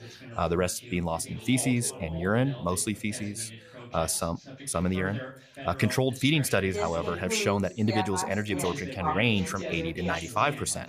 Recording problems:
background chatter; loud; throughout; 3 voices, 10 dB below the speech

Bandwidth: 14.5 kHz